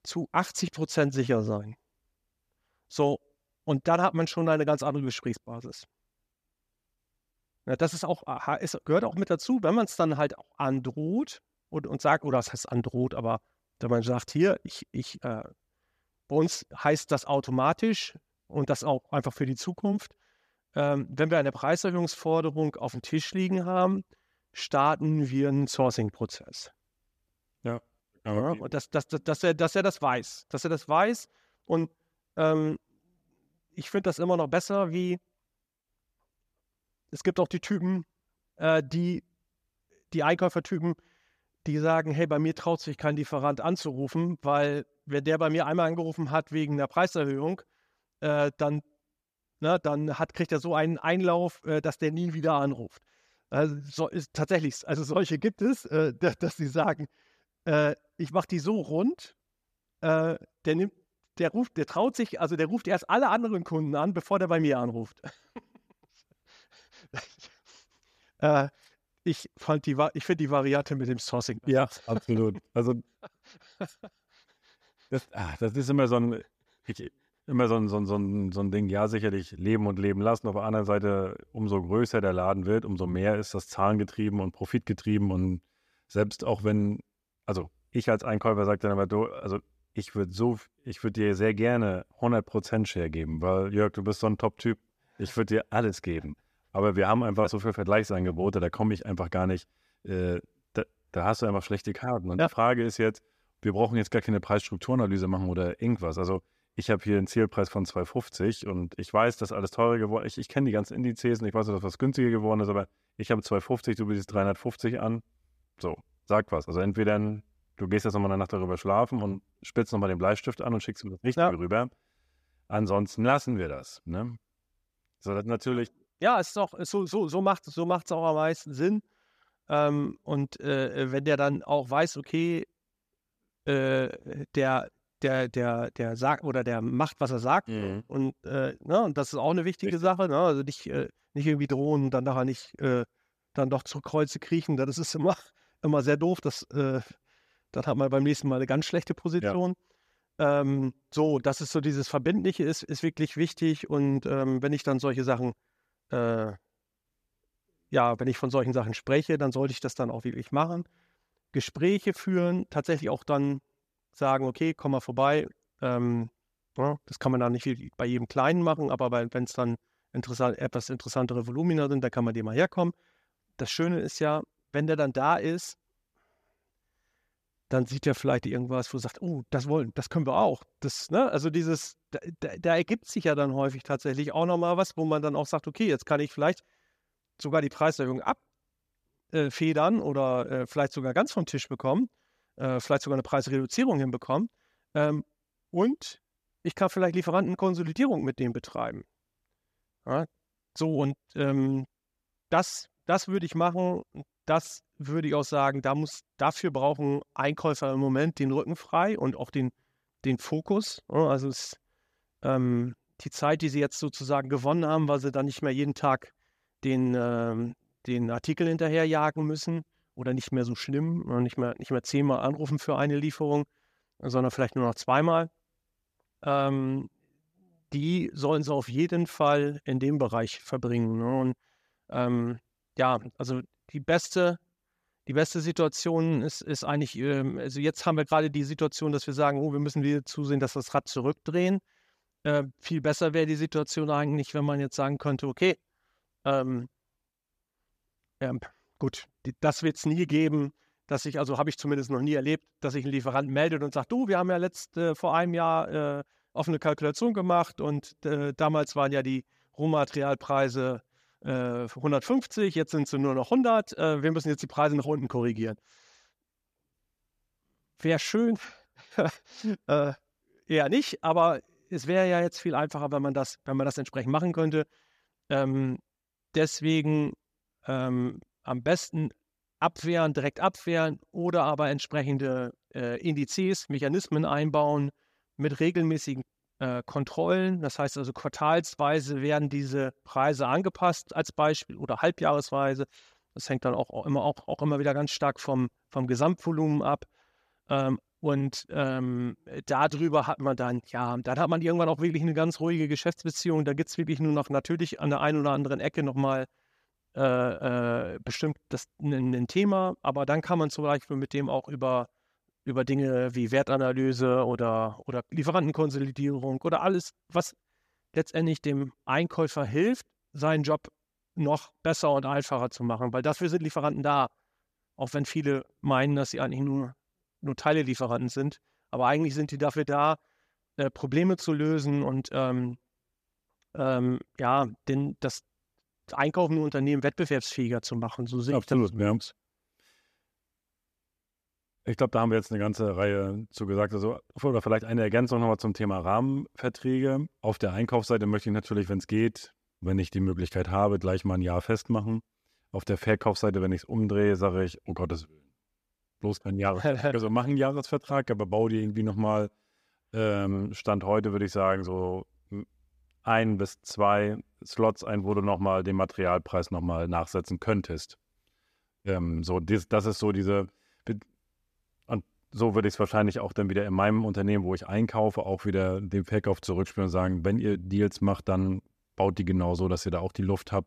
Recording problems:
none

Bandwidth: 14.5 kHz